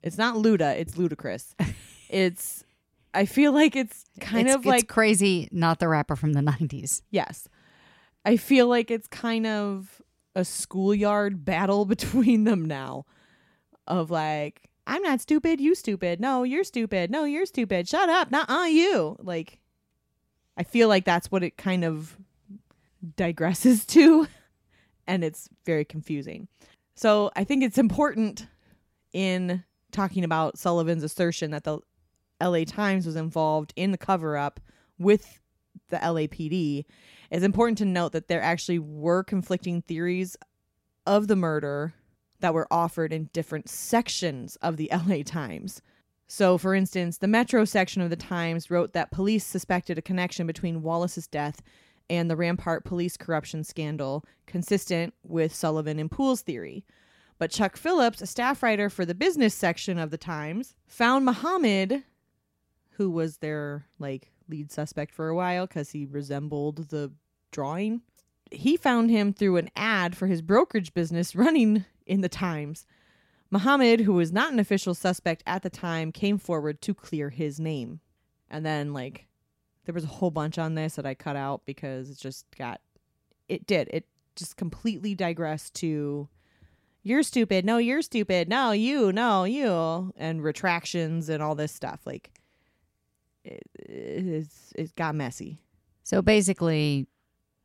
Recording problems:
none

